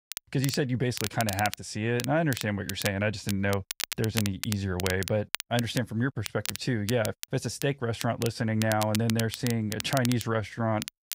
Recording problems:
crackle, like an old record; loud; 8 dB below the speech

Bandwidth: 15.5 kHz